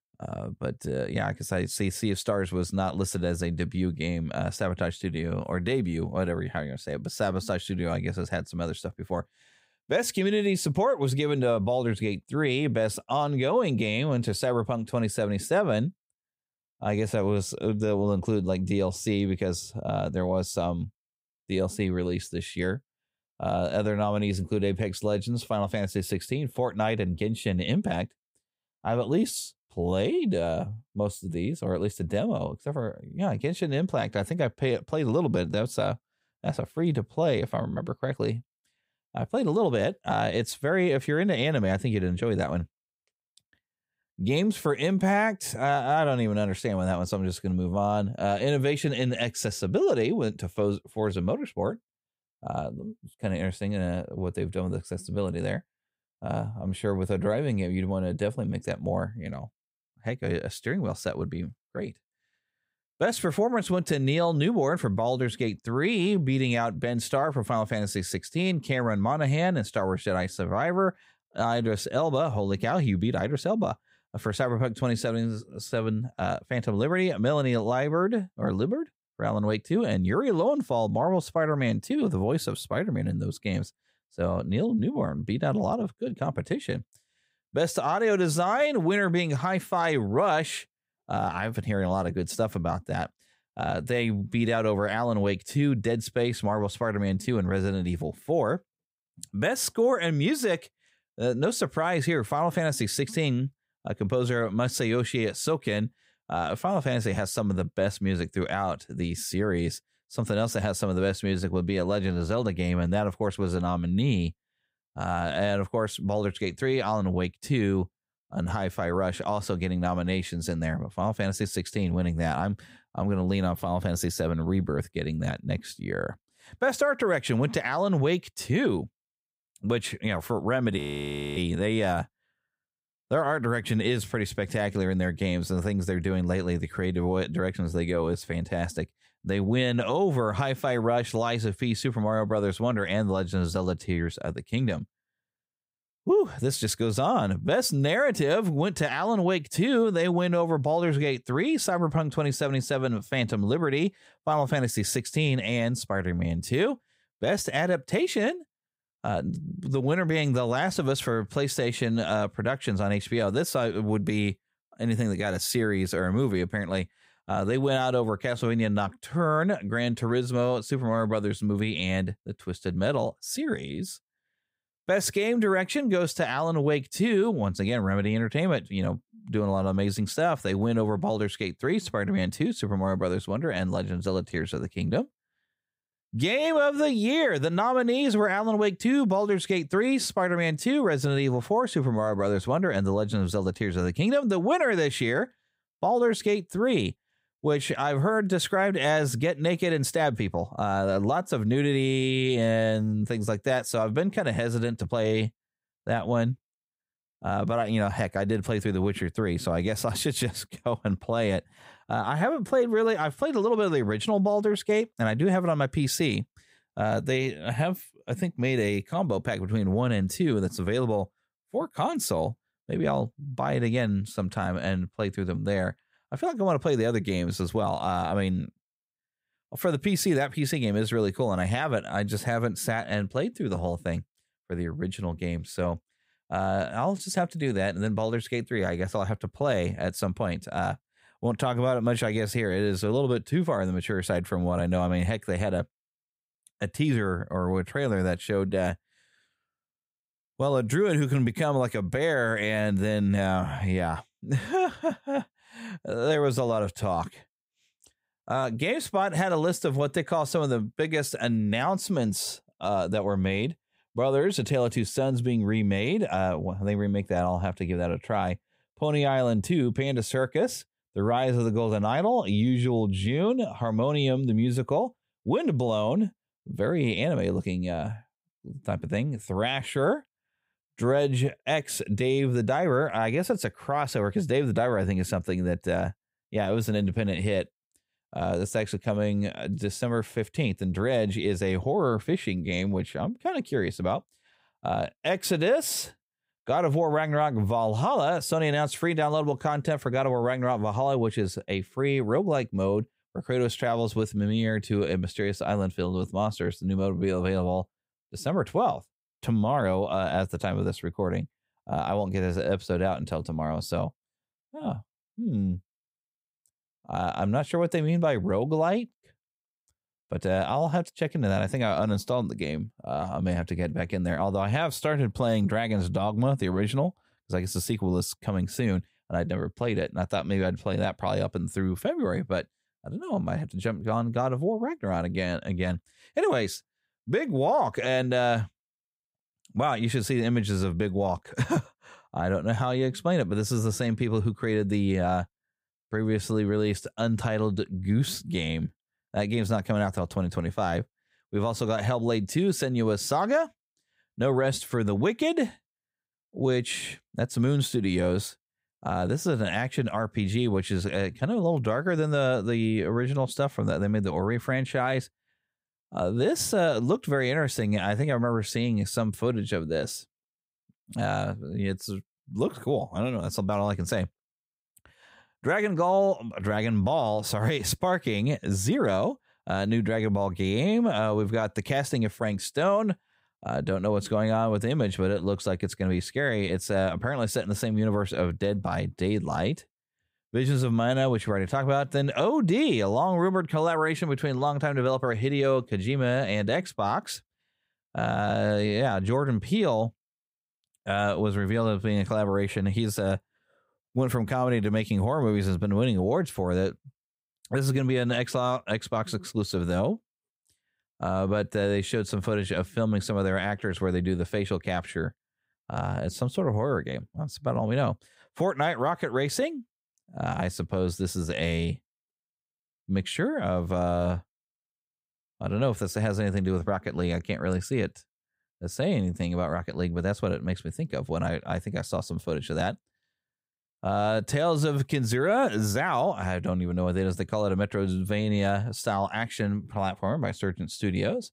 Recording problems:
audio freezing; at 2:11 for 0.5 s

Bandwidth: 15.5 kHz